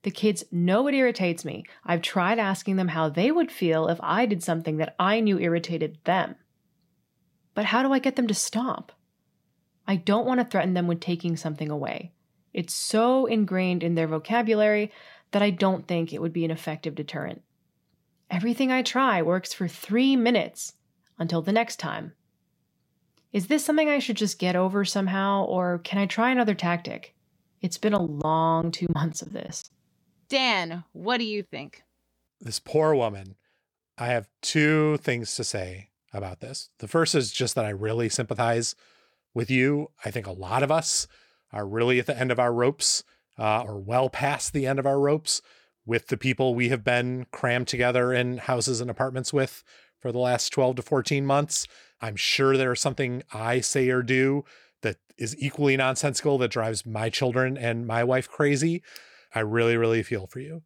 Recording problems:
choppy; very; from 28 to 30 s; 9% of the speech affected

